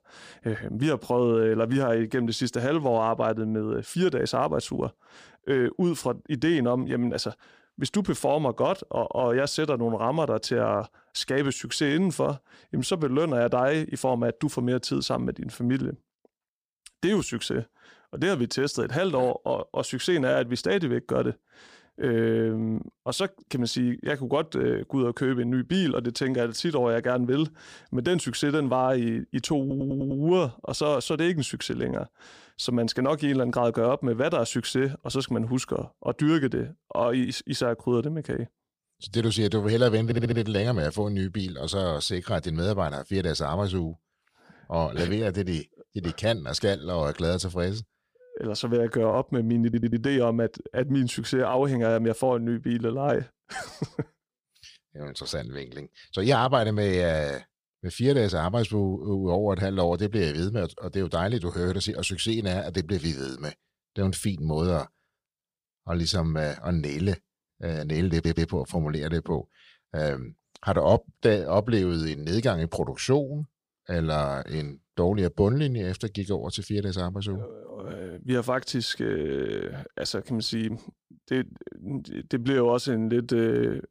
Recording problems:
audio stuttering; 4 times, first at 30 s

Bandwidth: 15 kHz